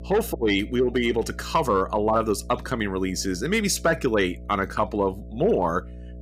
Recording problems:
electrical hum; faint; throughout; 60 Hz, 25 dB below the speech

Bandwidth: 15.5 kHz